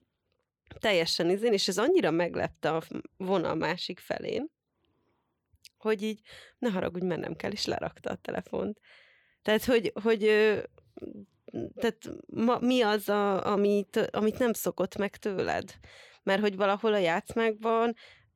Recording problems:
none

